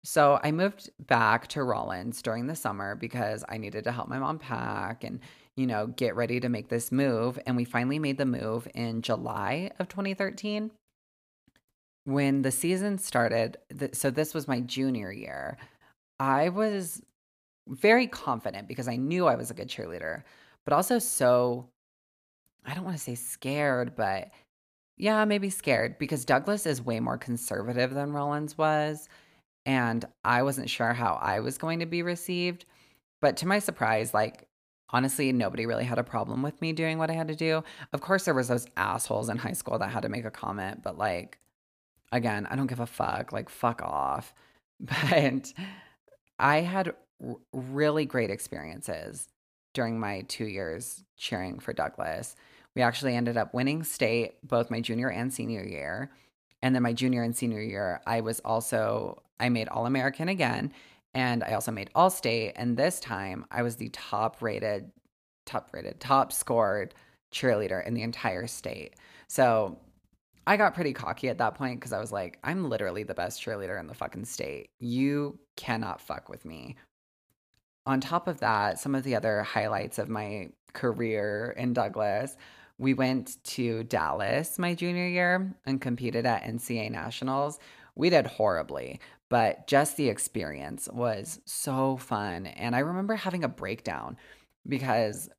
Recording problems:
none

